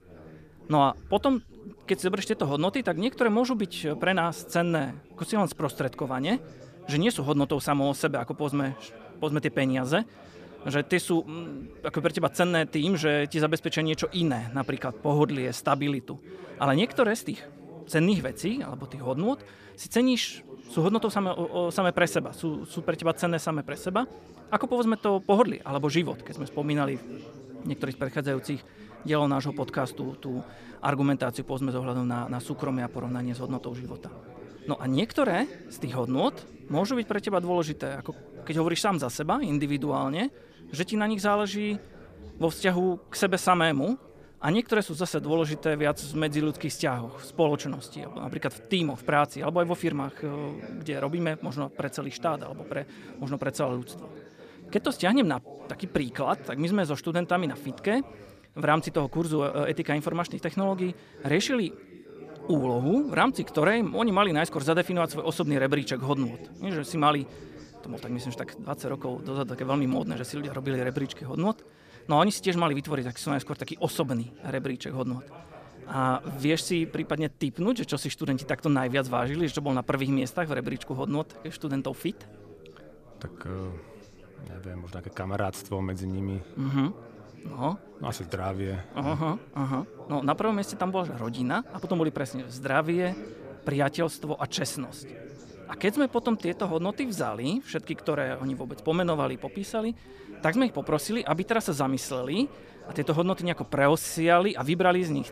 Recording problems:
background chatter; noticeable; throughout; 3 voices, 20 dB below the speech

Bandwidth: 14.5 kHz